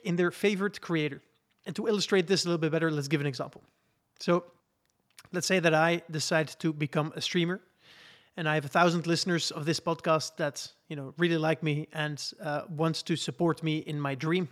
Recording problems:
none

